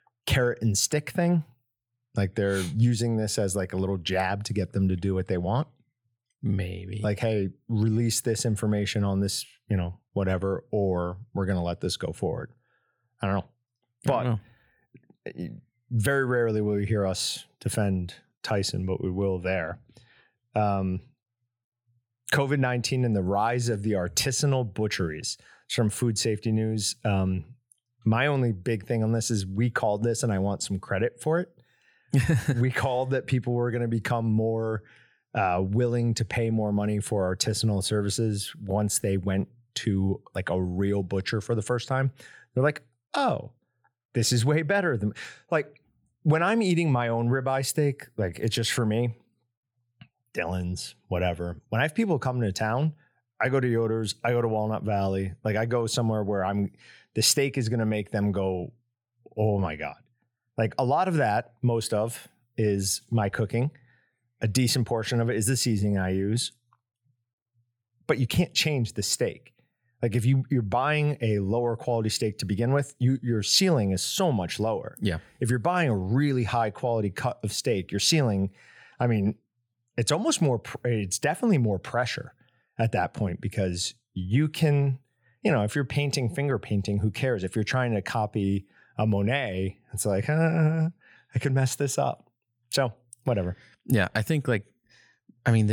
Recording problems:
abrupt cut into speech; at the end

